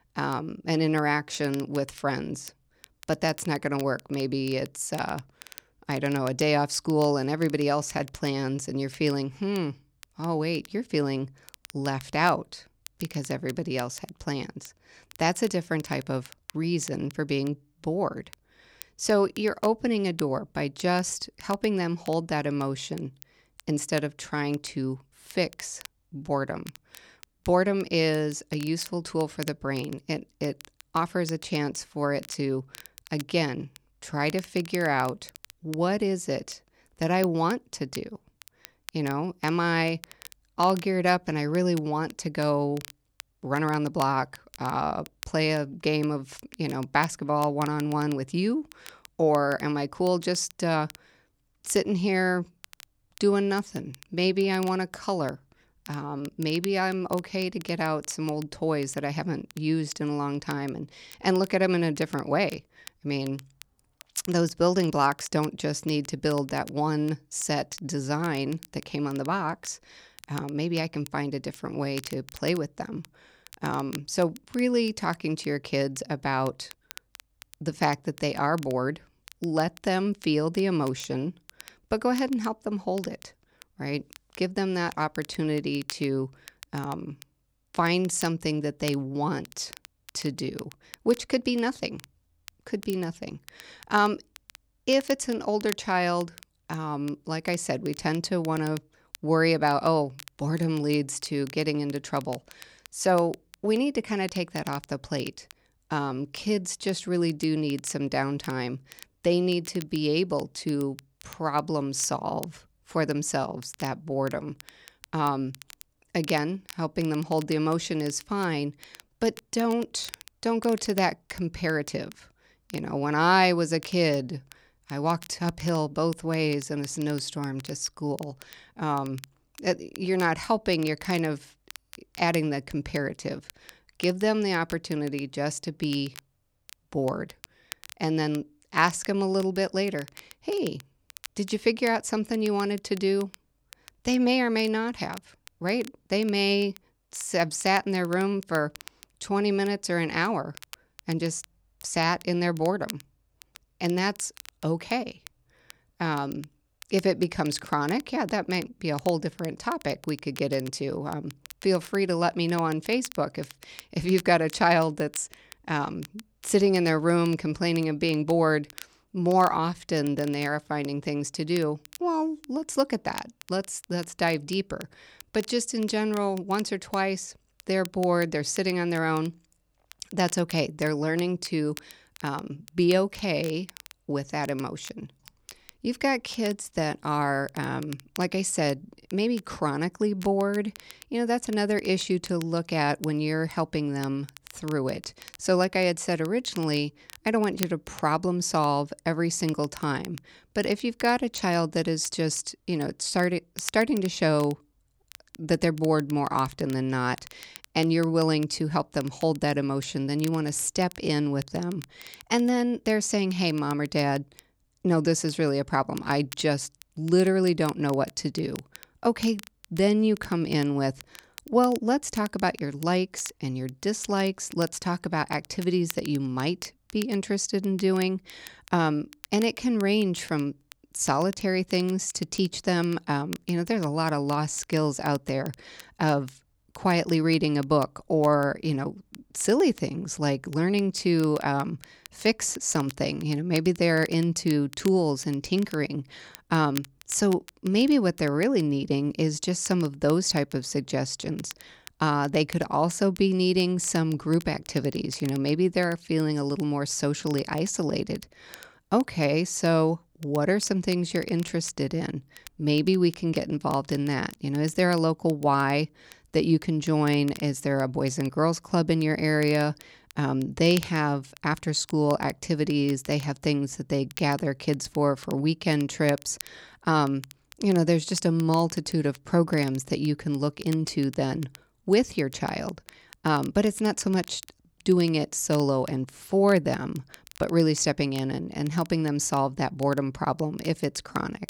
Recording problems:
crackle, like an old record; faint; 20 dB below the speech

